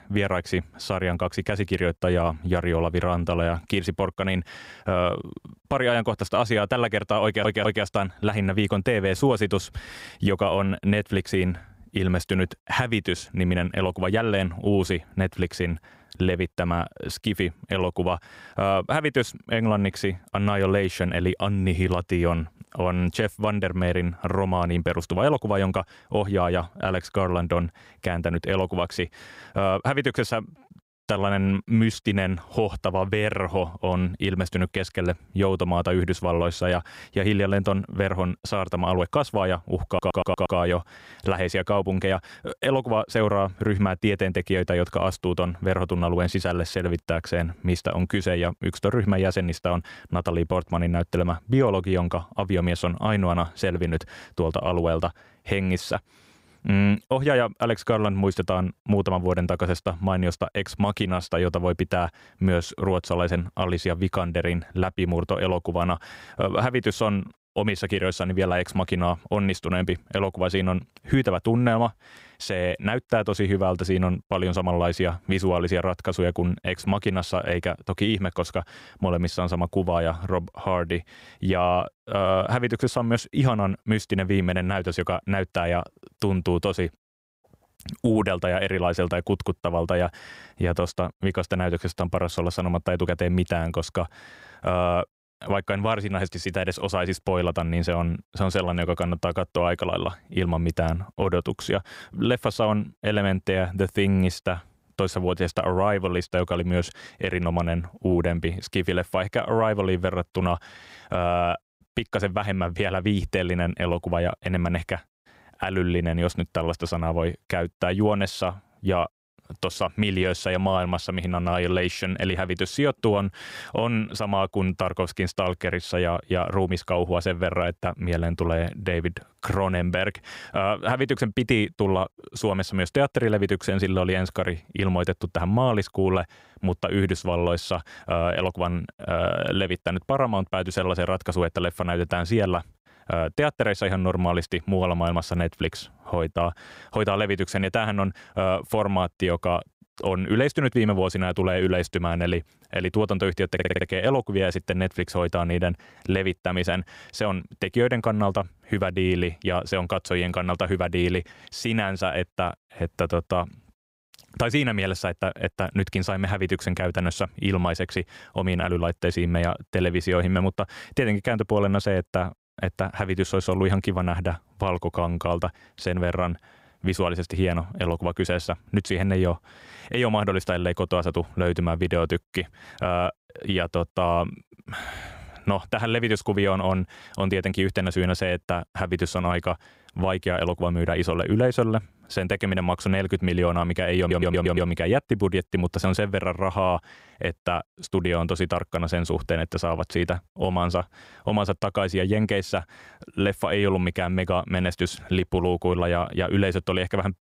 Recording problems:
audio stuttering; 4 times, first at 7 s

